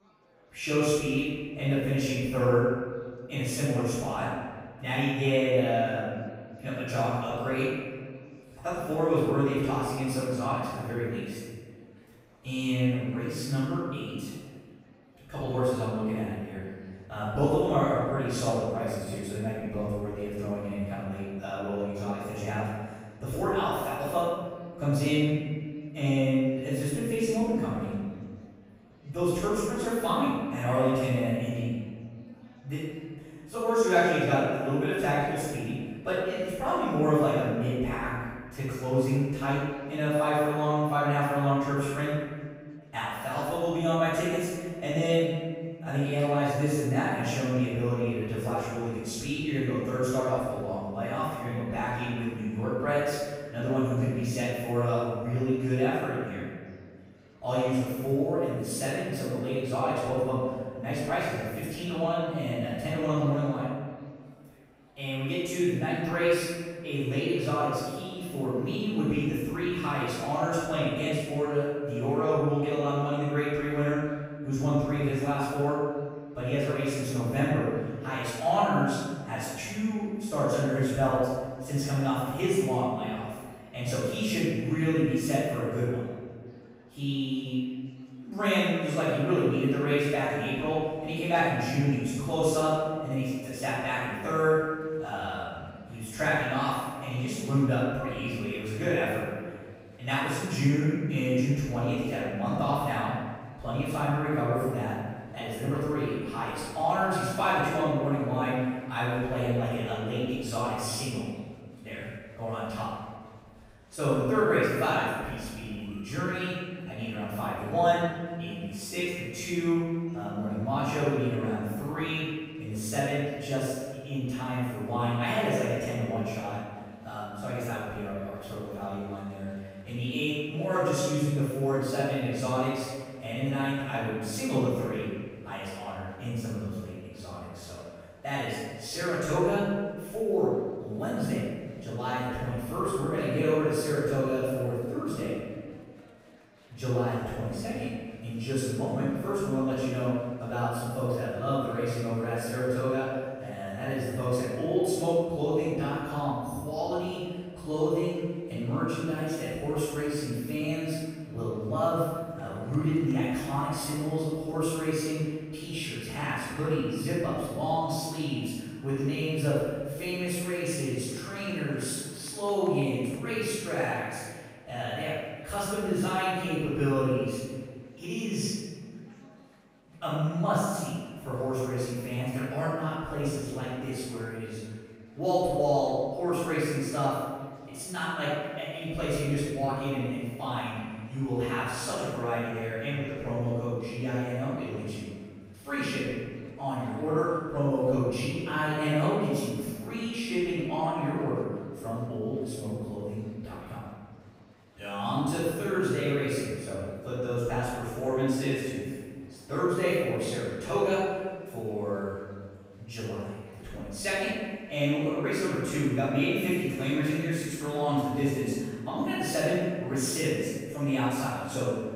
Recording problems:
room echo; strong; dies away in 1.5 s
off-mic speech; far
murmuring crowd; faint; throughout; 30 dB below the speech

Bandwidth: 15.5 kHz